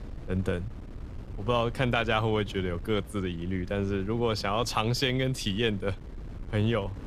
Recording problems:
wind noise on the microphone; occasional gusts; 20 dB below the speech

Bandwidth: 14.5 kHz